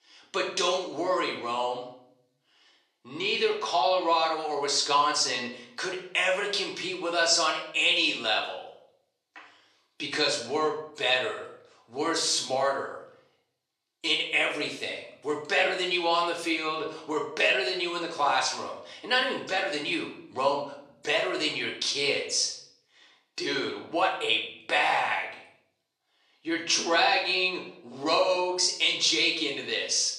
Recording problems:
off-mic speech; far
thin; somewhat; fading below 400 Hz
room echo; slight; dies away in 0.6 s

